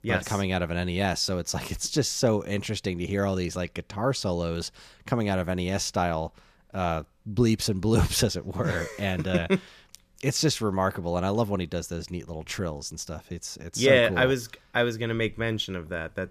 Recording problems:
none

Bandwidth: 14.5 kHz